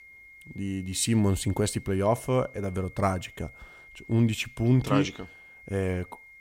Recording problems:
high-pitched whine; faint; throughout; 2 kHz, 20 dB below the speech

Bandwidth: 16 kHz